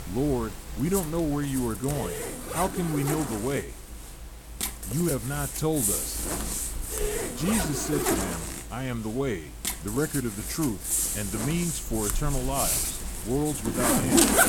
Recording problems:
household noises; very loud; throughout; 1 dB above the speech

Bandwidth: 17 kHz